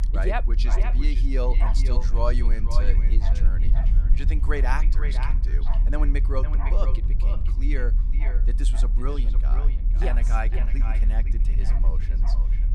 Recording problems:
echo of what is said; strong; throughout; 510 ms later, 8 dB below the speech
animal sounds; noticeable; throughout; 10 dB below the speech
low rumble; noticeable; throughout; 10 dB below the speech

